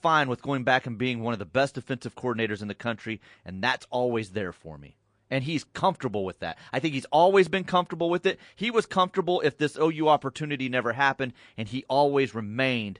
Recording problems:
garbled, watery; slightly; nothing above 10 kHz

